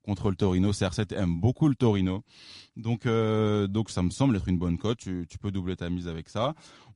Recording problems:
garbled, watery; slightly; nothing above 10.5 kHz

